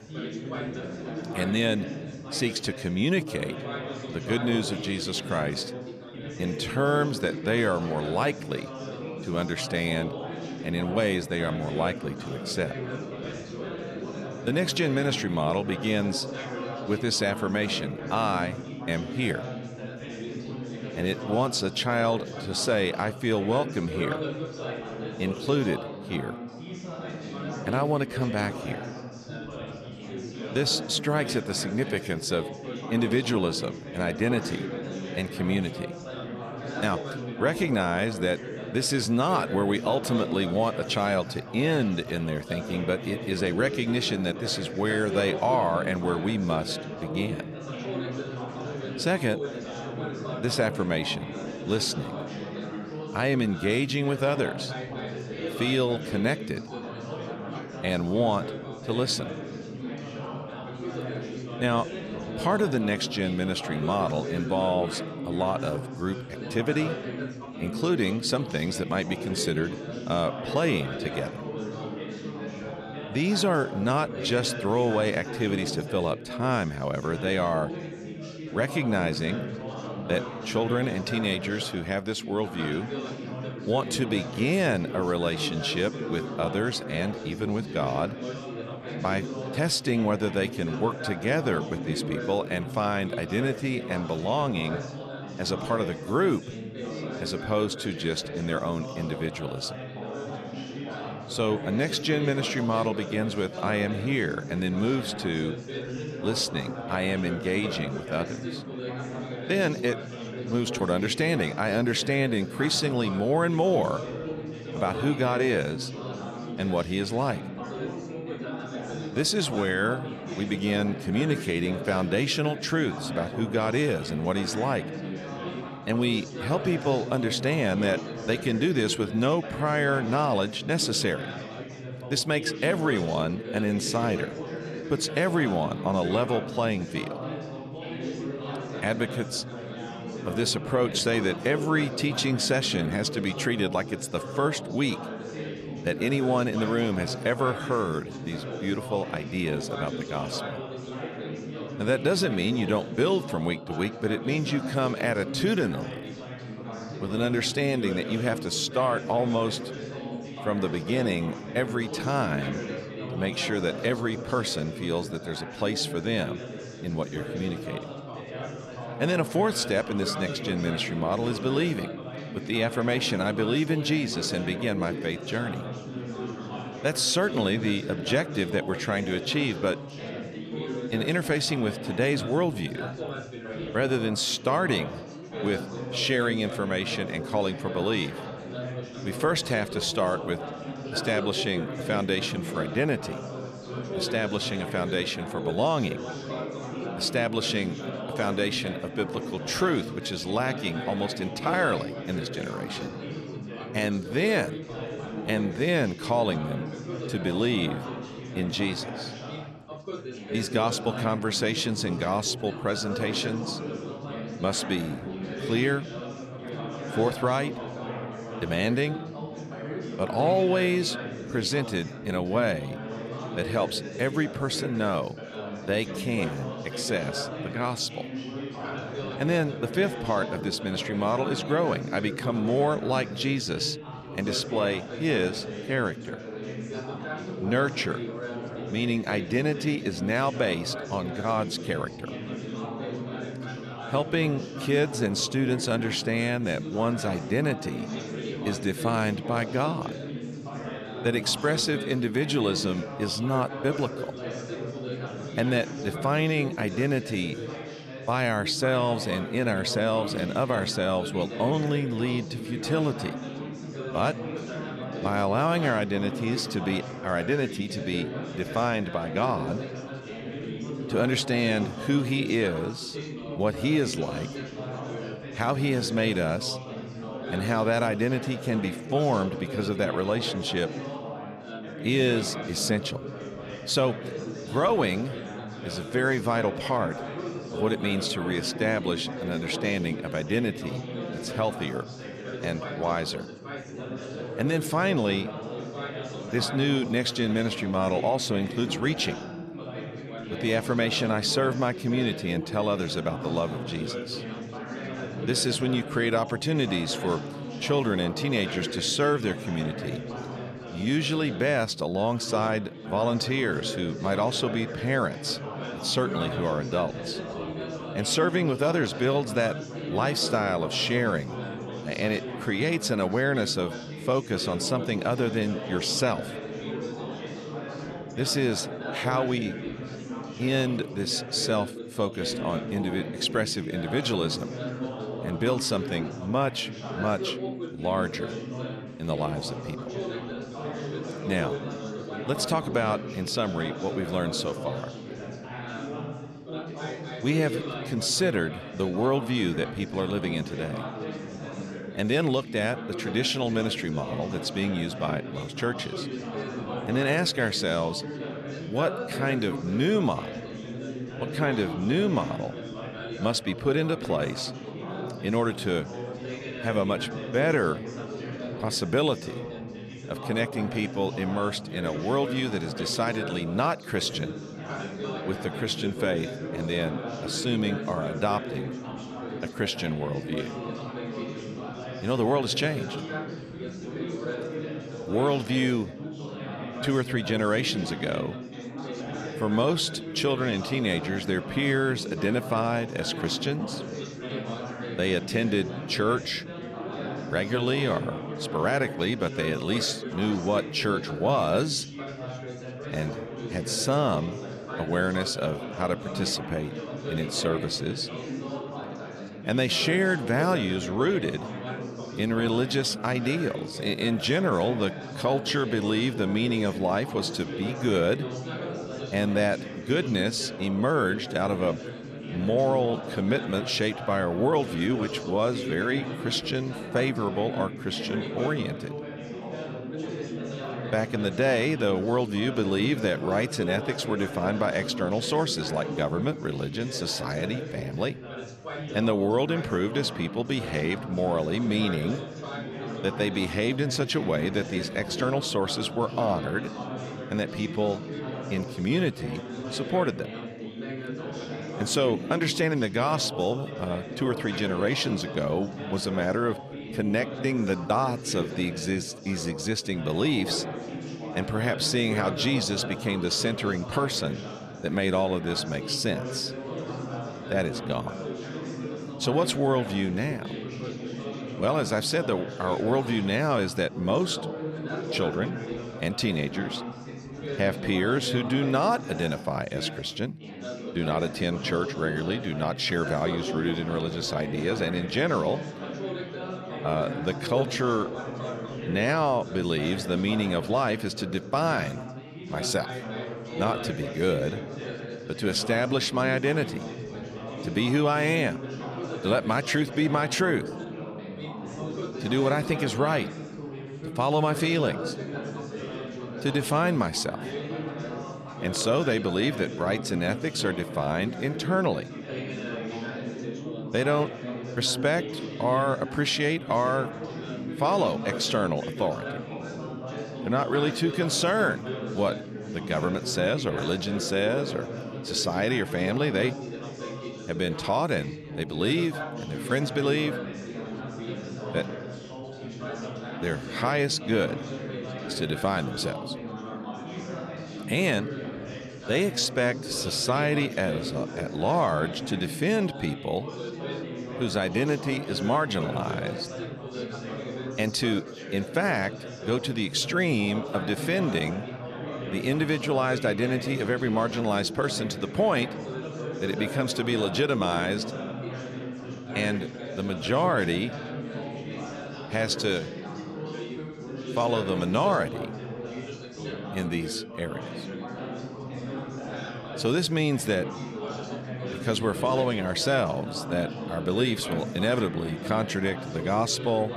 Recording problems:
background chatter; loud; throughout; 4 voices, 8 dB below the speech

